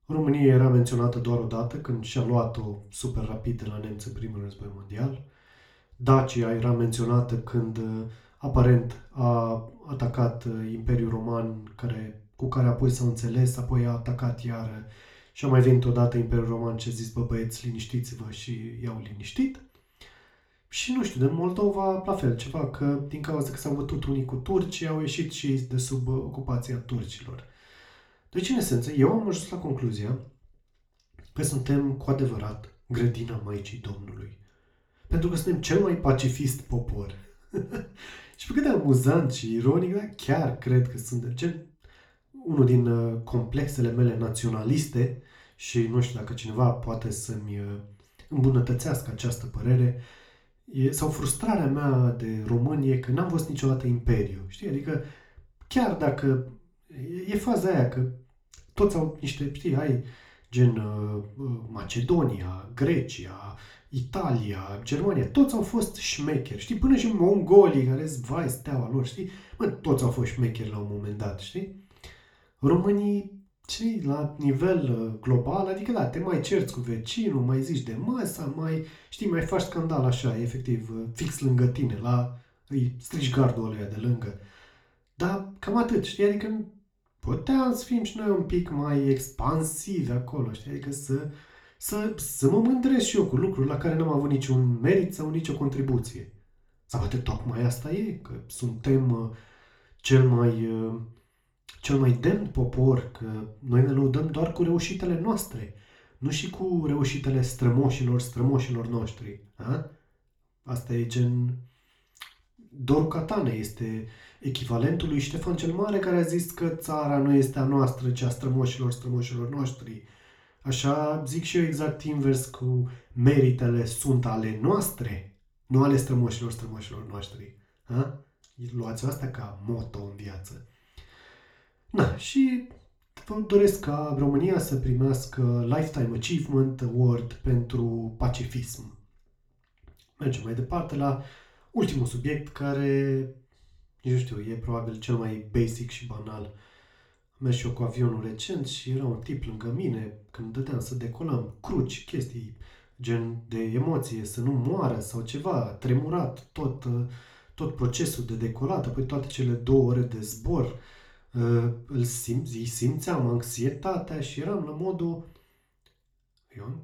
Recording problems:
room echo; slight; dies away in 0.4 s
off-mic speech; somewhat distant

